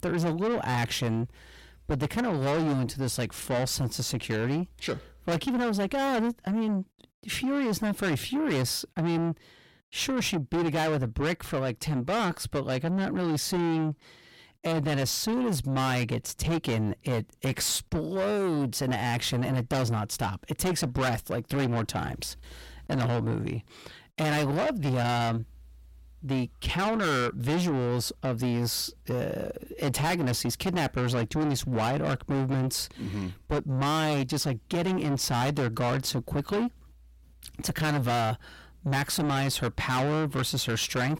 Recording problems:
distortion; heavy; 5 dB below the speech

